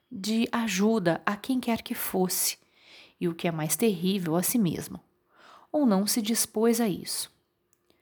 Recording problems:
none

